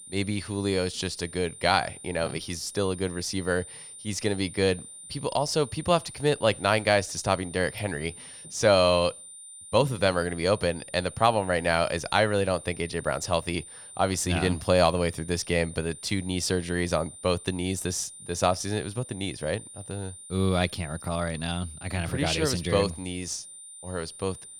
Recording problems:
high-pitched whine; noticeable; throughout; 9 kHz, 15 dB below the speech

